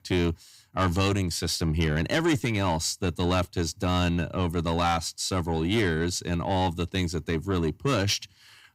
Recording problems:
distortion; slight; 10 dB below the speech

